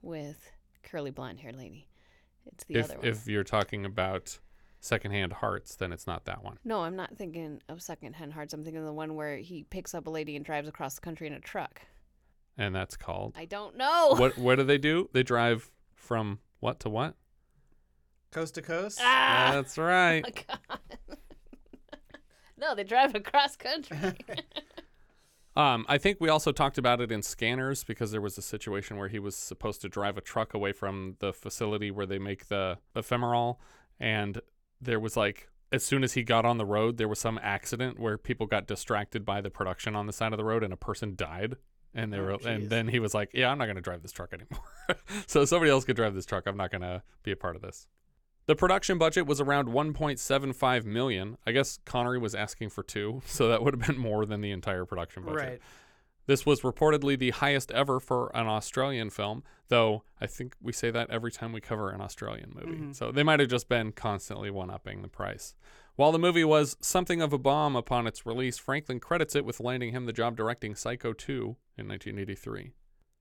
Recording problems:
none

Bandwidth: 18 kHz